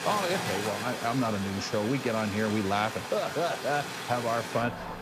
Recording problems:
rain or running water; loud; throughout; 5 dB below the speech

